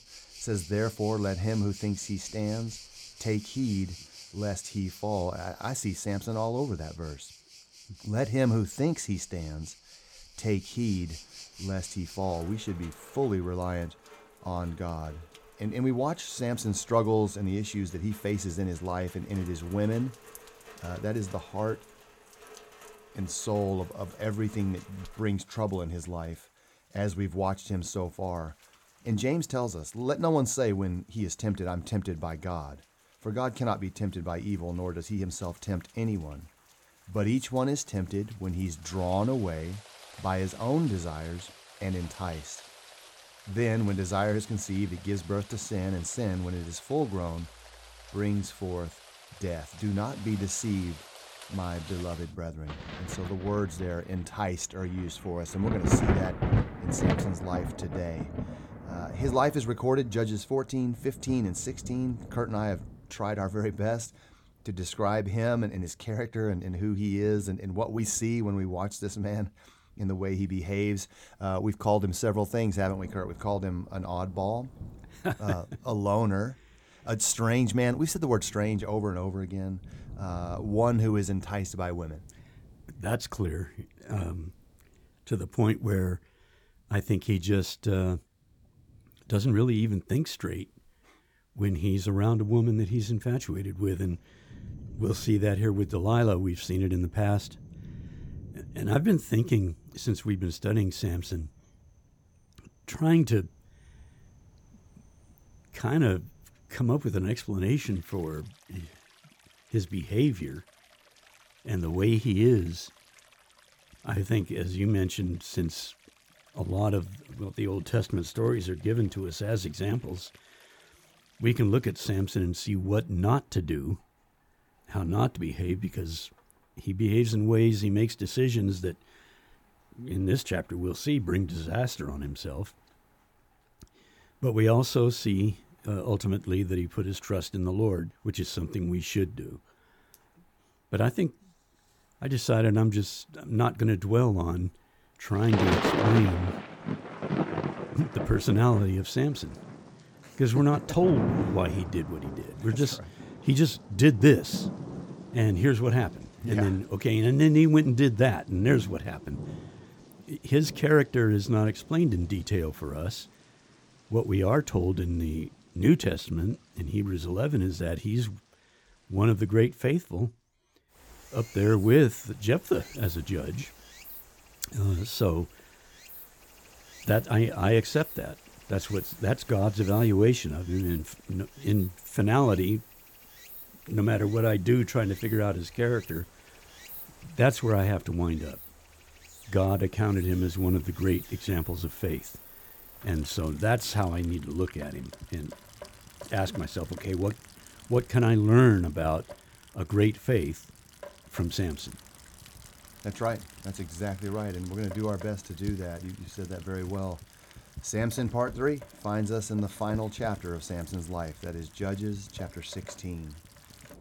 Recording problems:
rain or running water; noticeable; throughout; 10 dB below the speech

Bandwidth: 18 kHz